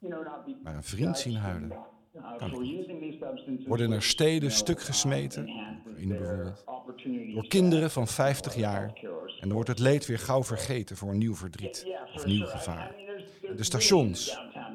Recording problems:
voice in the background; noticeable; throughout; 10 dB below the speech

